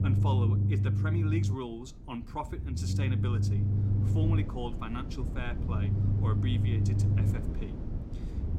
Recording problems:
low rumble; loud; throughout; 2 dB below the speech

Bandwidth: 16 kHz